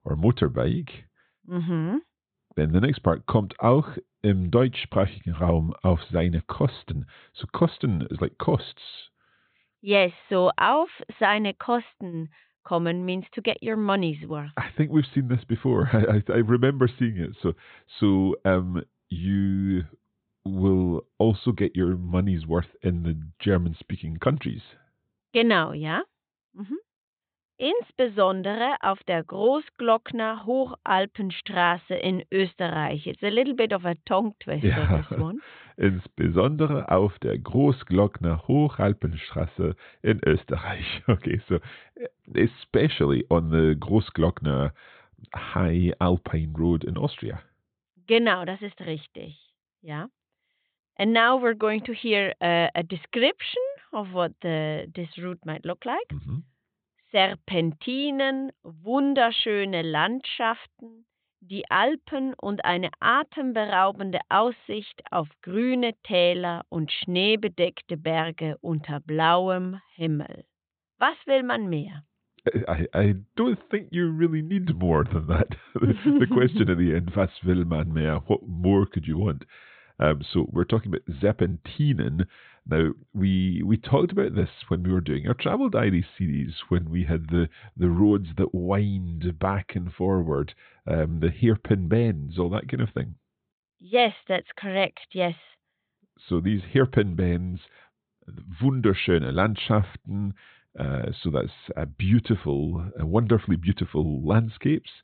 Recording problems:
high frequencies cut off; severe; nothing above 4 kHz

